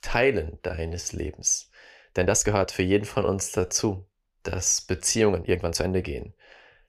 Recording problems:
uneven, jittery; strongly; from 0.5 to 6 s

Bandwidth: 15 kHz